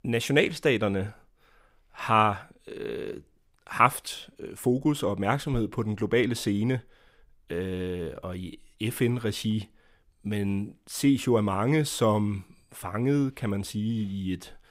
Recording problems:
none

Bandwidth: 15.5 kHz